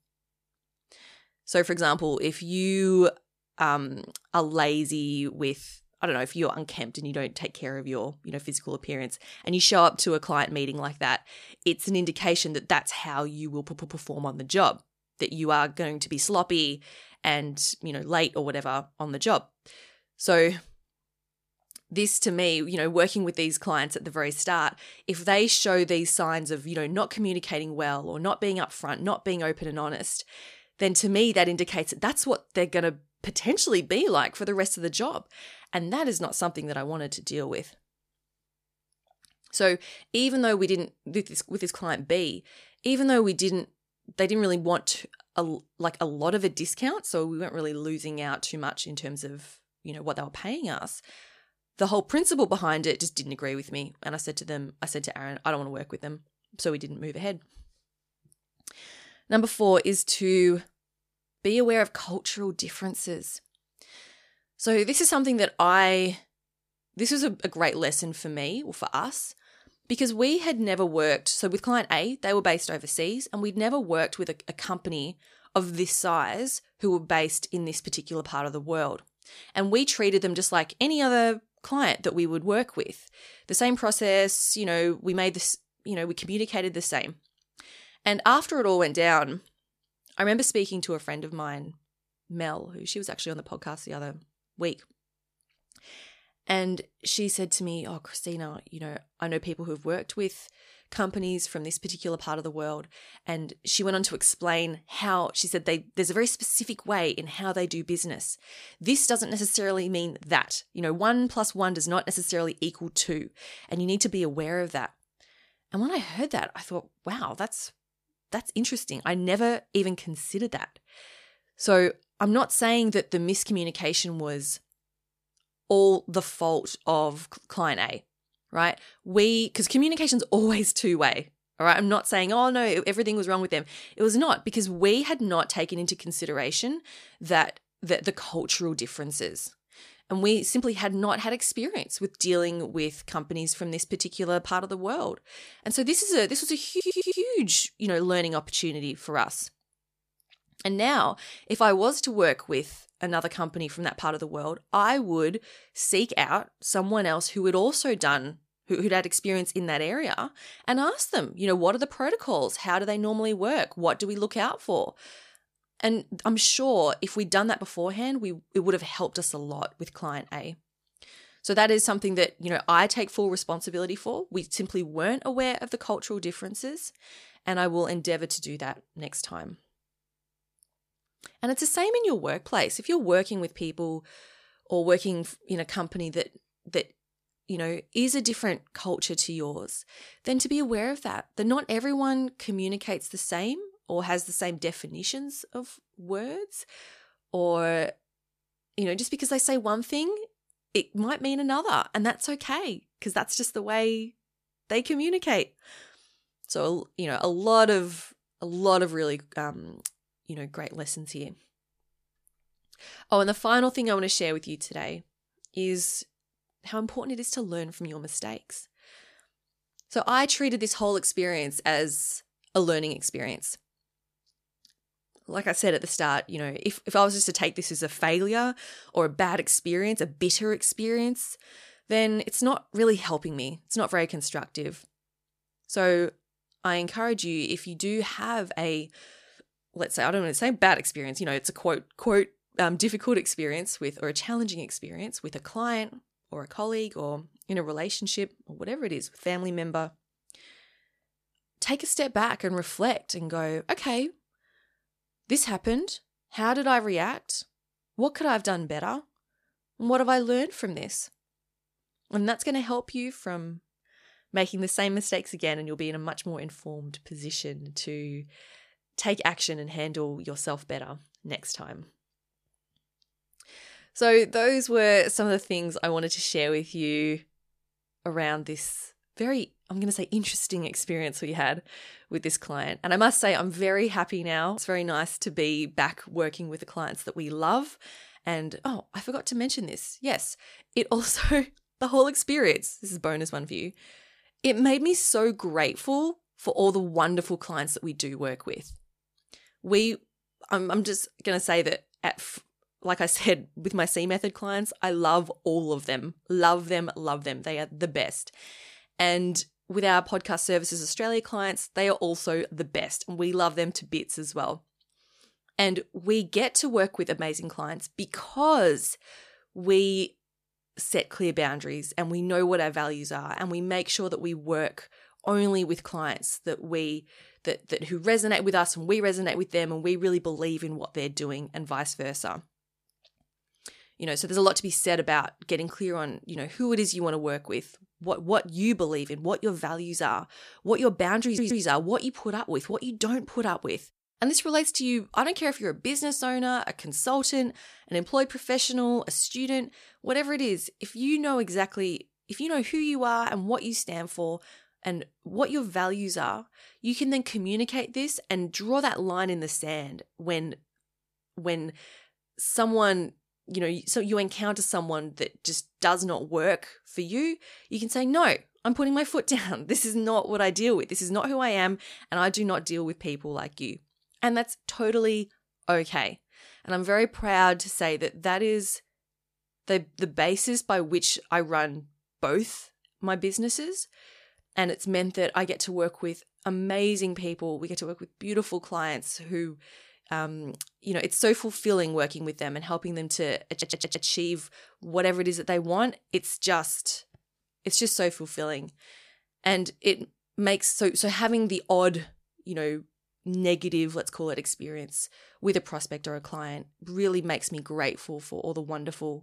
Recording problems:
audio stuttering; 4 times, first at 14 s

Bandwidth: 14.5 kHz